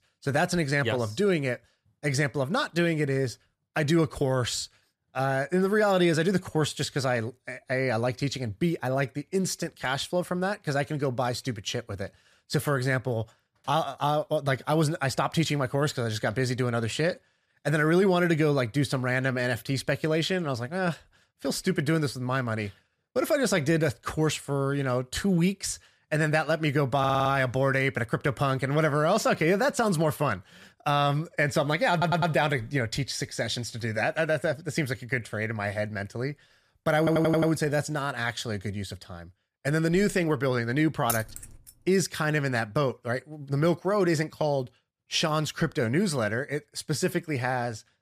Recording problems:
audio stuttering; at 27 s, at 32 s and at 37 s
jangling keys; noticeable; at 41 s; peak 5 dB below the speech

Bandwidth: 14.5 kHz